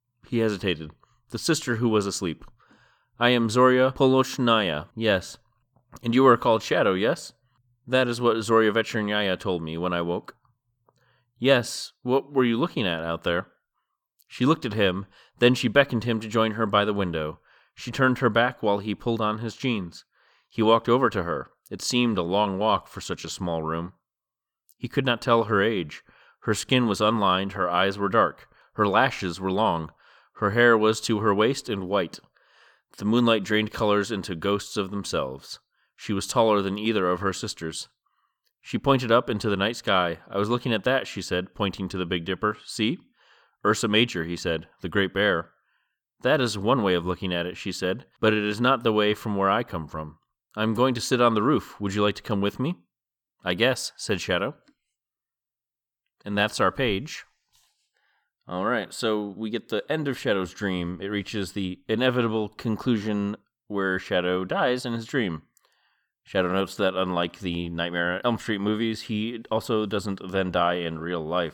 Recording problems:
none

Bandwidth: 18.5 kHz